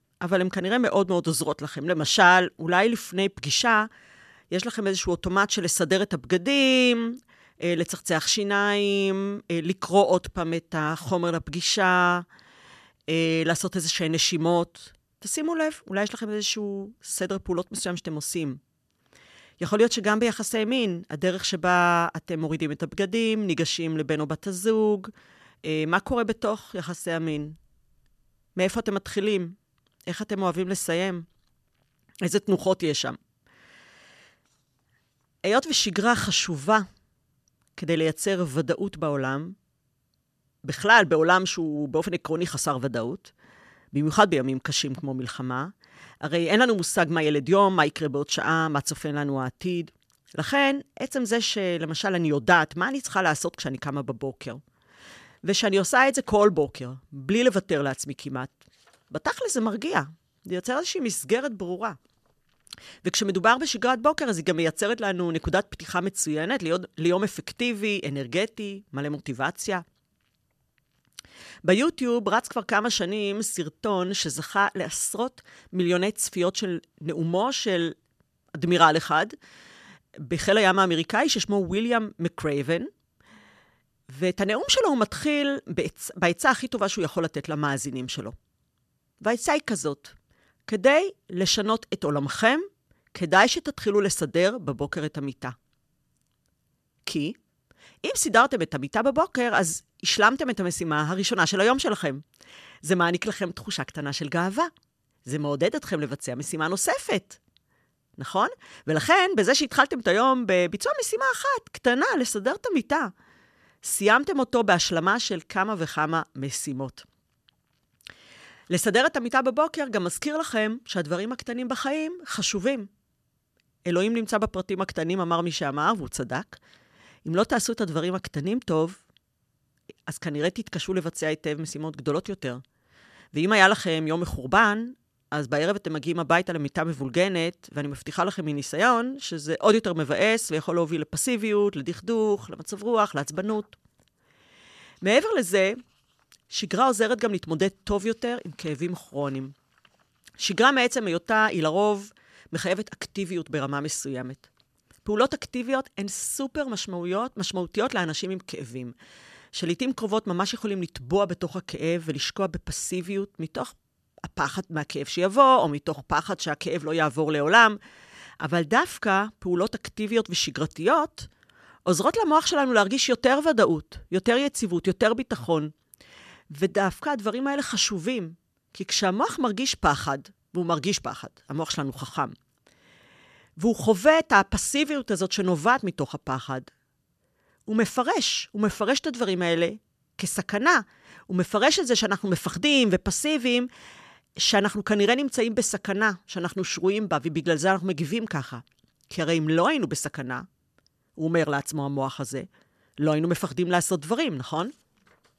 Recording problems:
none

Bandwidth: 13.5 kHz